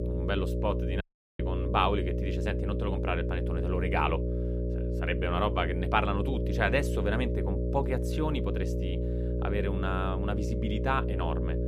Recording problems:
electrical hum; loud; throughout; 60 Hz, 6 dB below the speech
audio cutting out; at 1 s

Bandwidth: 15 kHz